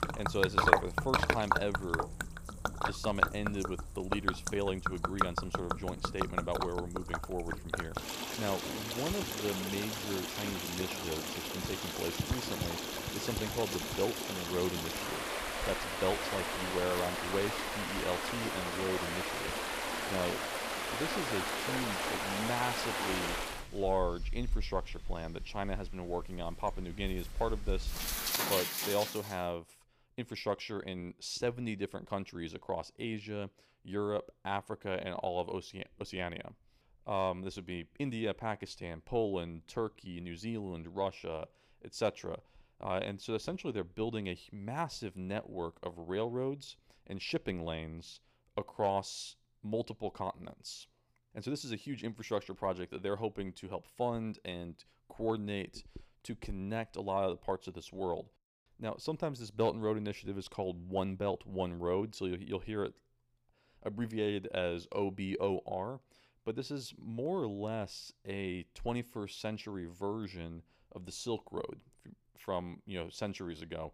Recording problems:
rain or running water; very loud; until 29 s; 3 dB above the speech

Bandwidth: 15 kHz